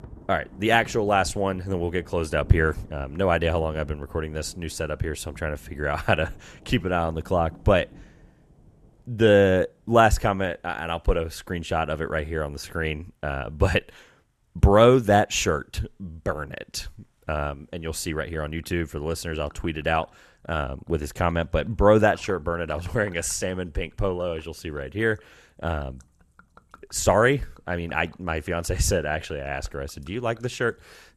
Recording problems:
rain or running water; faint; throughout; 25 dB below the speech

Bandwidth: 13.5 kHz